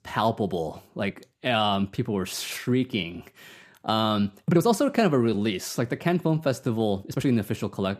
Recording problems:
uneven, jittery; strongly; from 1 to 7.5 s

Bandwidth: 14.5 kHz